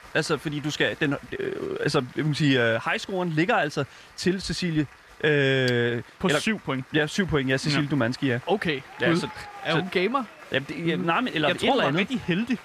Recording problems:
crowd noise; faint; throughout; 20 dB below the speech

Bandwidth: 14.5 kHz